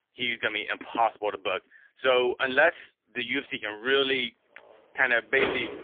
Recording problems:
phone-call audio; poor line; nothing above 3.5 kHz
traffic noise; loud; from 4.5 s on; 5 dB below the speech

